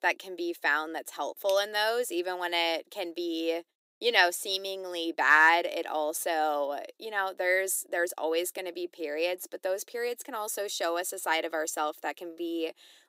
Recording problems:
thin; very; fading below 350 Hz

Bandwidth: 15.5 kHz